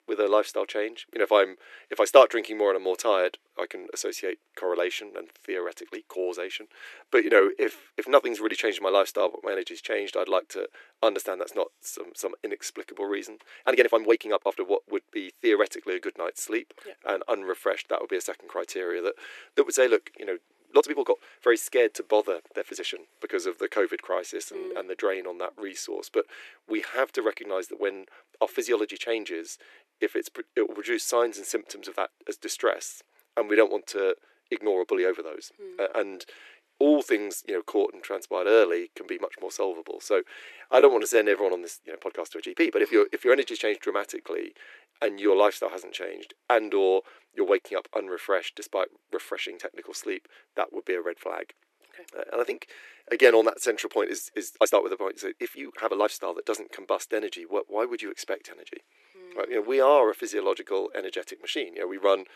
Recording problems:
thin; very; fading below 300 Hz
uneven, jittery; strongly; from 7 s to 1:00

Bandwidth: 13.5 kHz